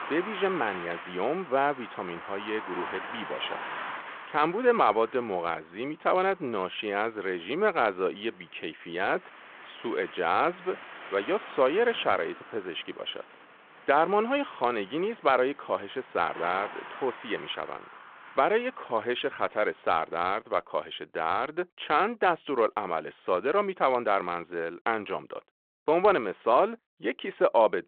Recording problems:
phone-call audio
traffic noise; noticeable; until 20 s; 15 dB below the speech

